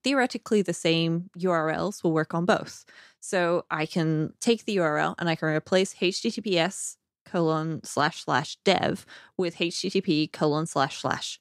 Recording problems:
none

